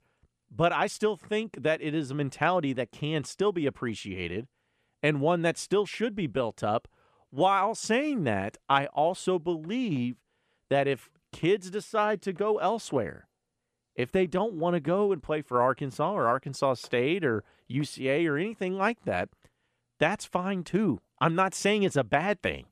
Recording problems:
none

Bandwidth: 13.5 kHz